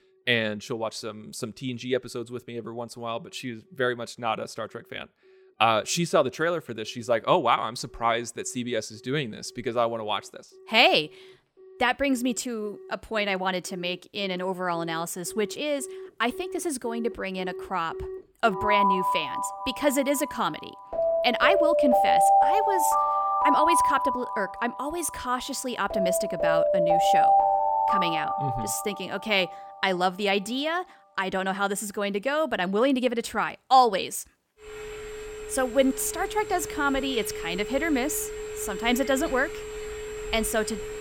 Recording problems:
alarms or sirens; very loud; throughout; 1 dB above the speech

